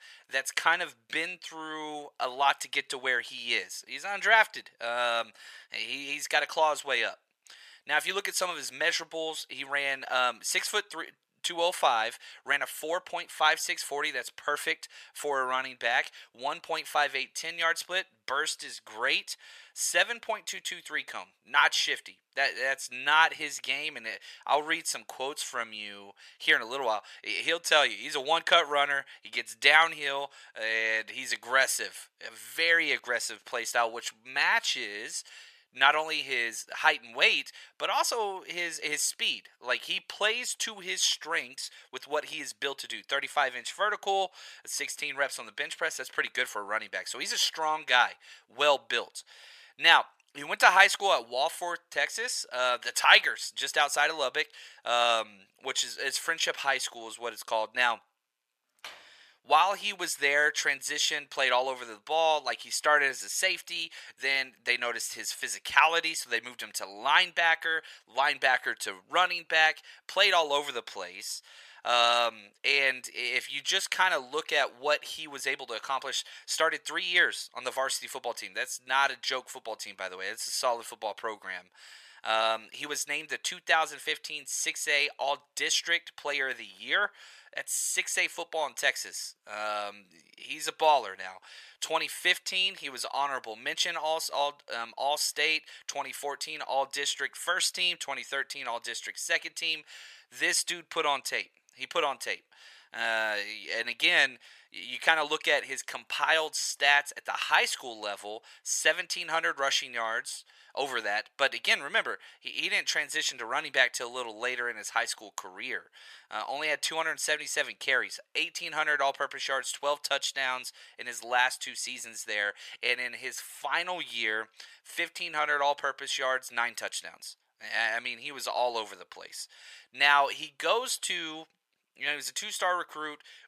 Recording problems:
thin; very; fading below 950 Hz
door banging; faint; at 59 s; peak 20 dB below the speech

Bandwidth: 14.5 kHz